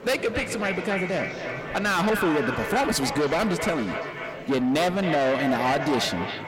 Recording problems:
distortion; heavy; 7 dB below the speech
echo of what is said; strong; throughout; 270 ms later, 6 dB below the speech
murmuring crowd; noticeable; throughout; 15 dB below the speech

